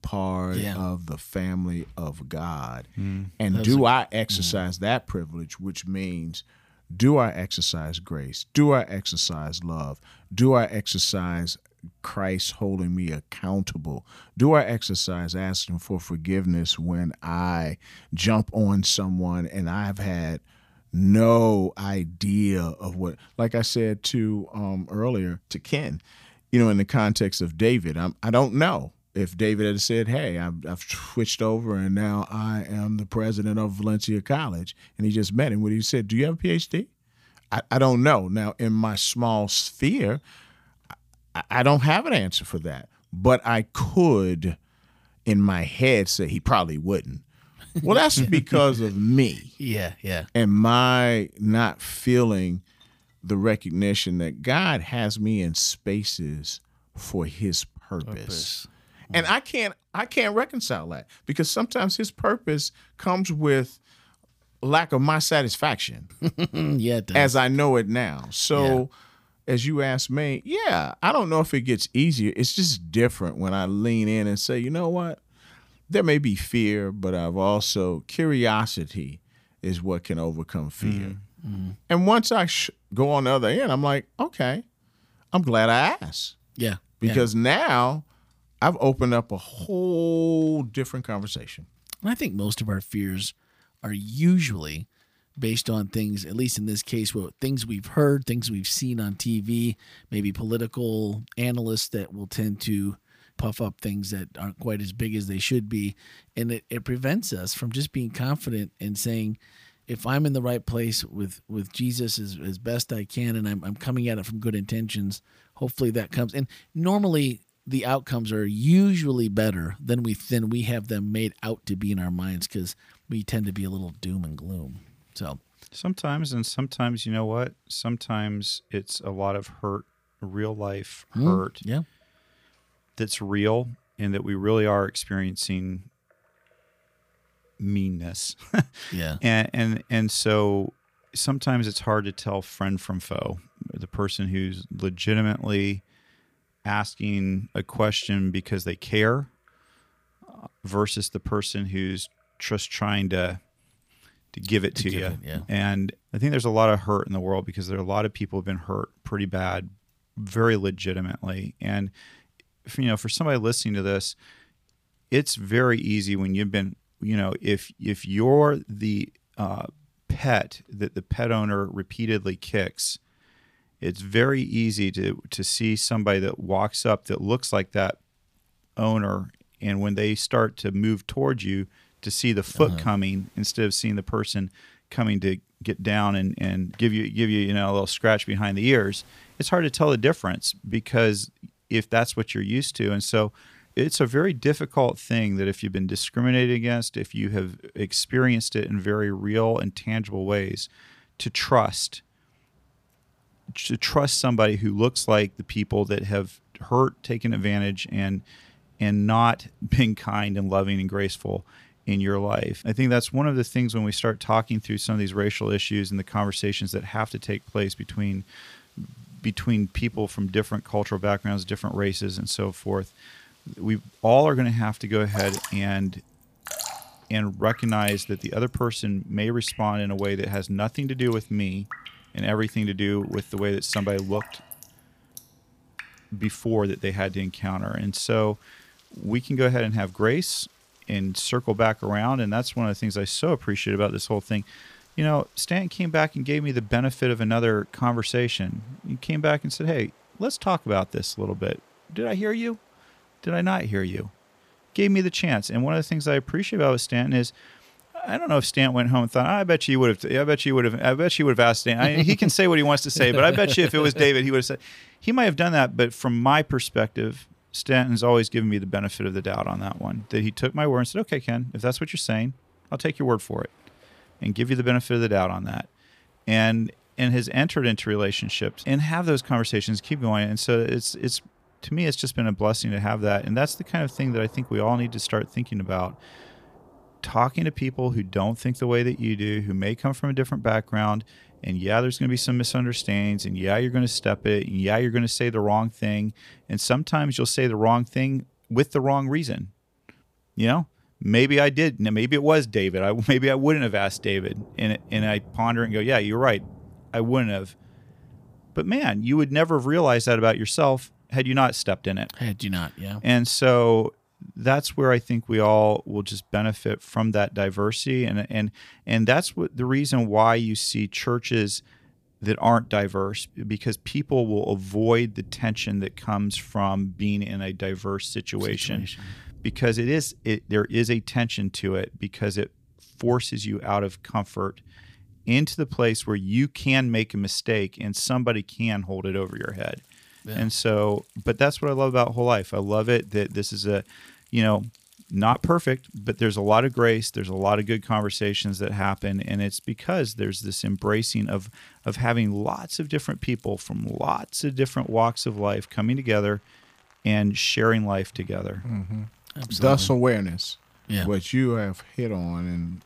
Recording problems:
rain or running water; faint; throughout; 25 dB below the speech

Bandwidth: 15 kHz